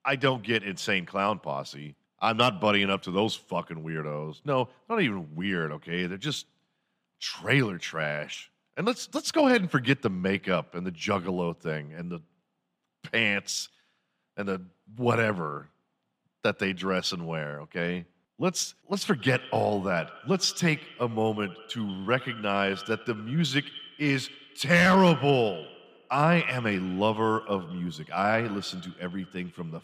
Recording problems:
echo of what is said; noticeable; from 19 s on; 90 ms later, 15 dB below the speech

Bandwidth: 15 kHz